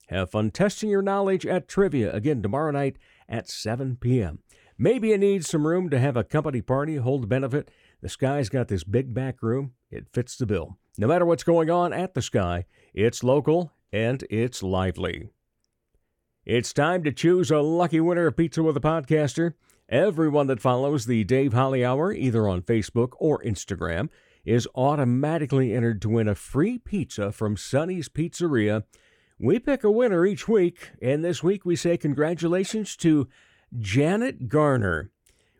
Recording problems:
none

